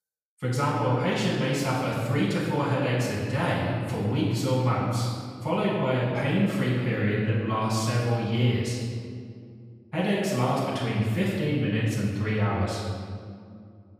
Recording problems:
room echo; strong; dies away in 2 s
off-mic speech; far

